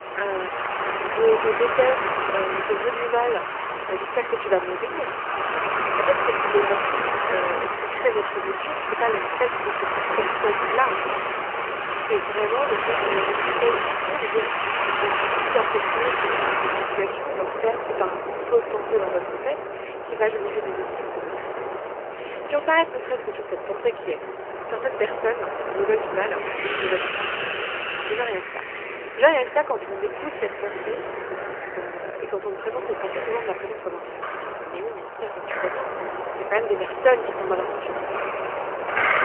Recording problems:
phone-call audio; poor line; nothing above 3 kHz
wind in the background; loud; throughout; as loud as the speech

